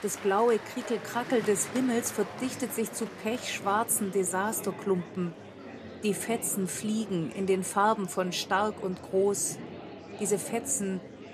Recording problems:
murmuring crowd; noticeable; throughout; 15 dB below the speech

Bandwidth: 14 kHz